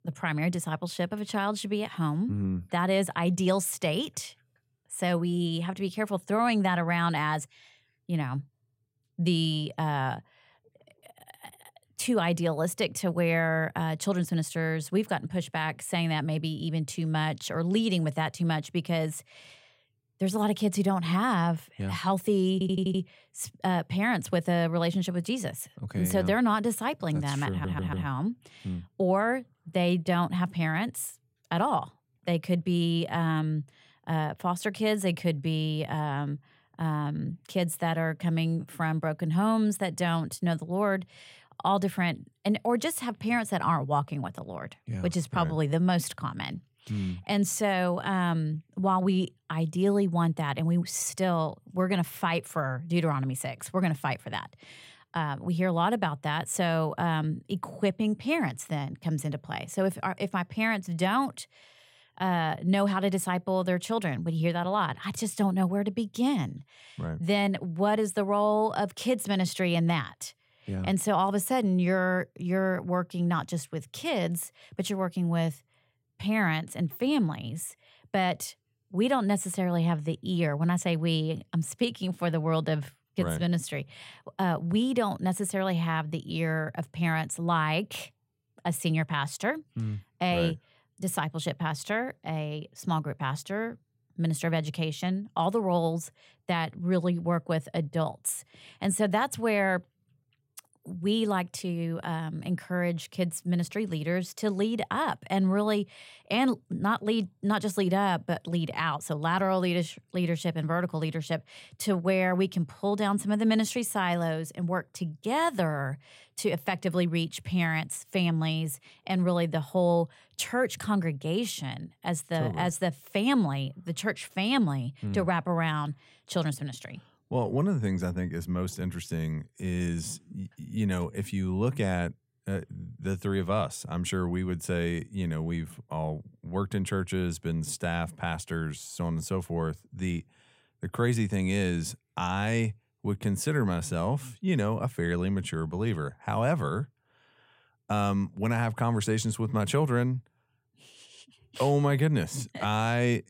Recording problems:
audio stuttering; at 23 s and at 28 s

